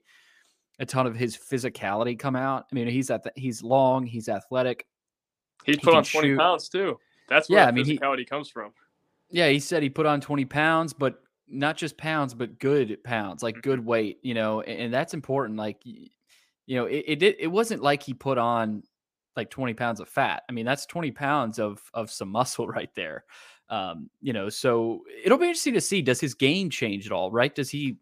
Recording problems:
none

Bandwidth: 15 kHz